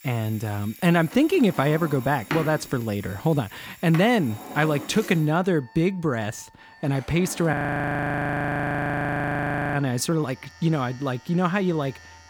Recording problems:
household noises; noticeable; throughout; 15 dB below the speech
alarms or sirens; faint; throughout; 20 dB below the speech
audio freezing; at 7.5 s for 2 s

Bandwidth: 18.5 kHz